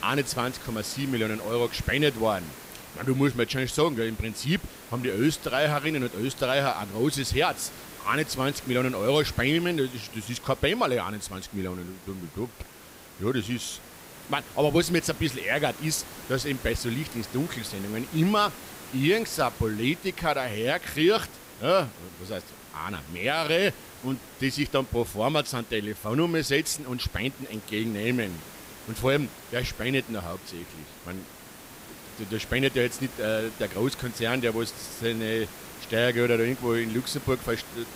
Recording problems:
hiss; noticeable; throughout; 15 dB below the speech

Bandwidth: 15.5 kHz